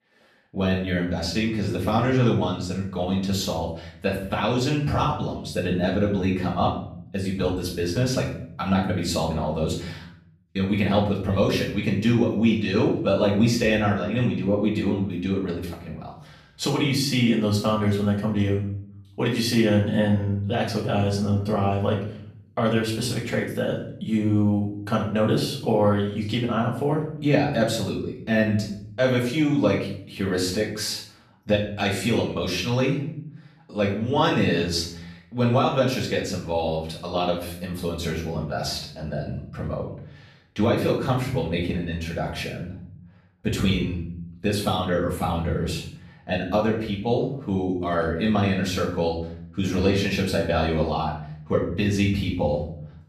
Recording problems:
off-mic speech; far
room echo; noticeable; dies away in 0.6 s

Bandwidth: 14.5 kHz